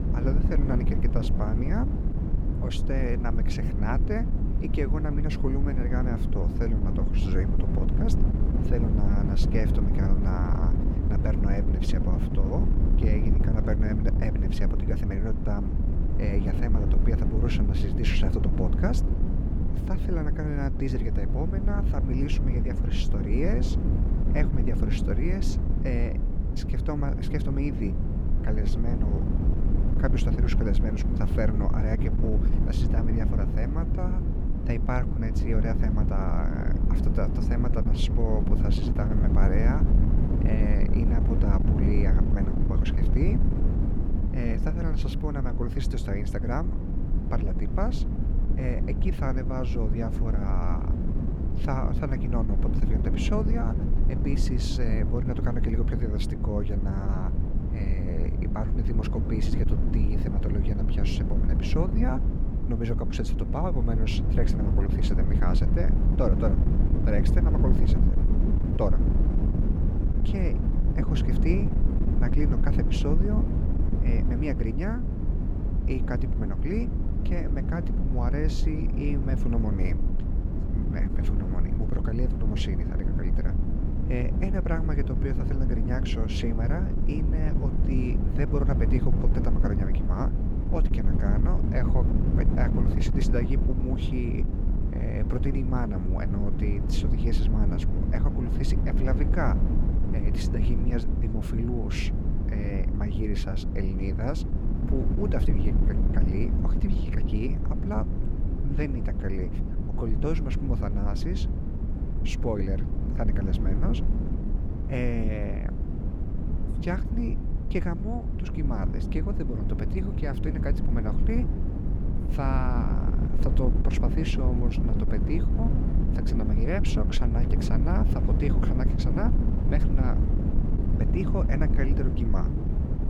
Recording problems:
wind noise on the microphone; heavy; 2 dB below the speech

